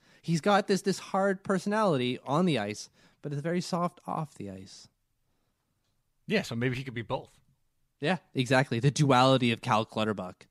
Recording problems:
none

